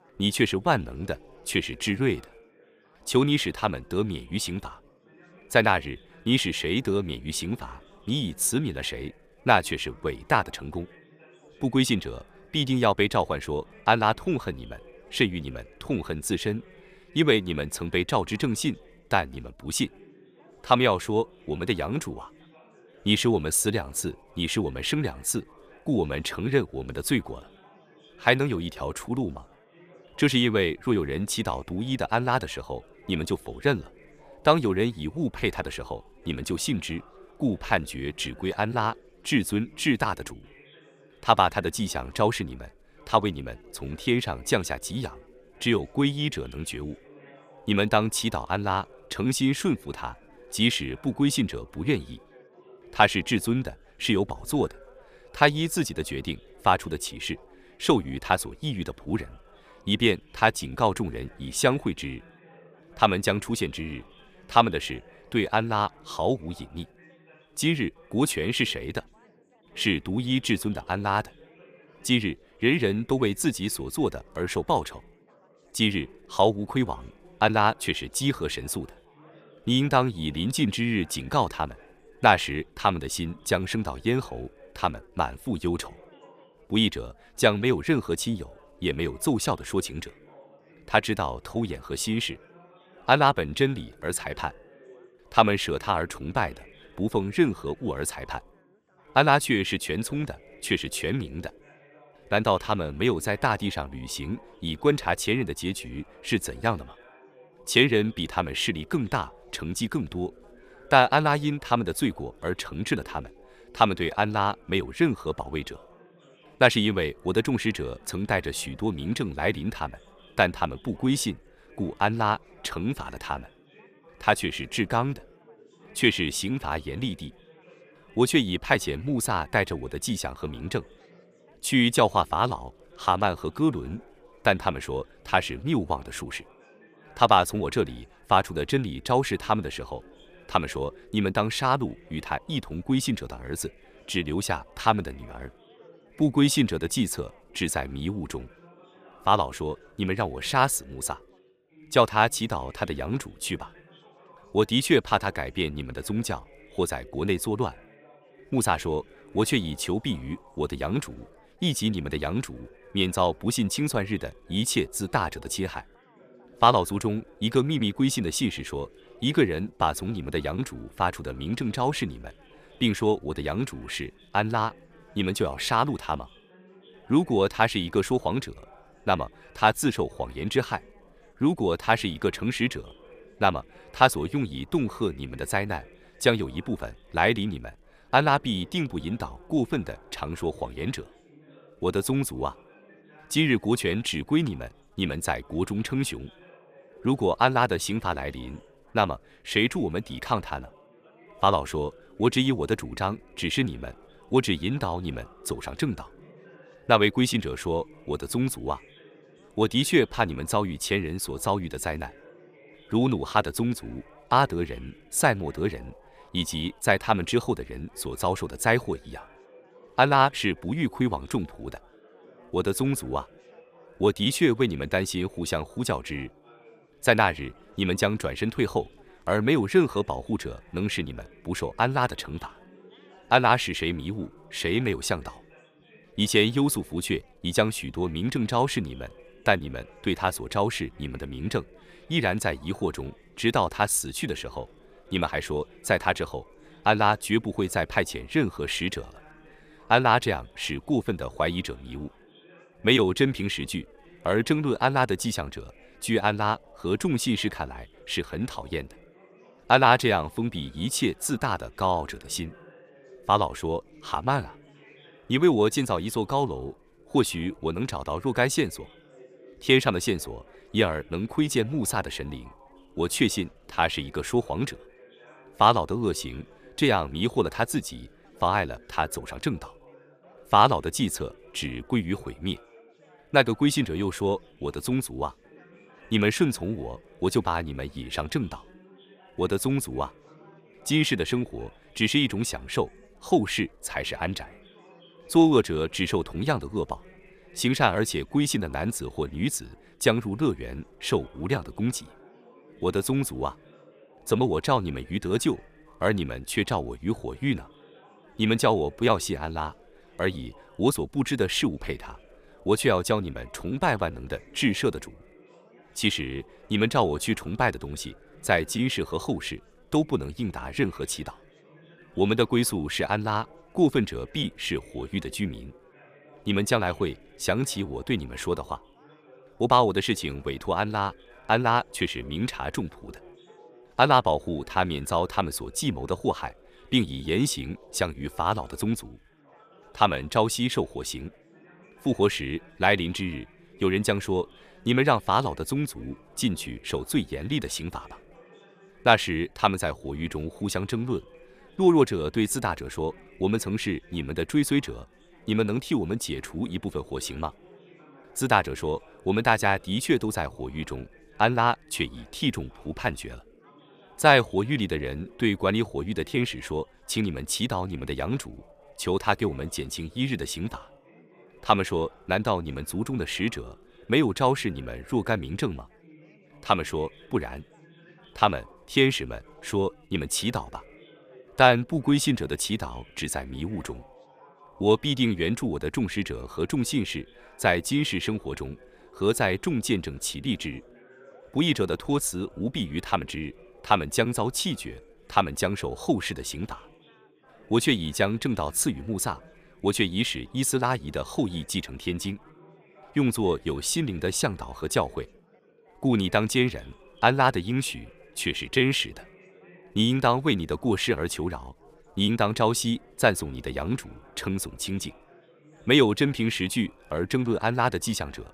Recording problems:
chatter from many people; faint; throughout; 25 dB below the speech

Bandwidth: 14.5 kHz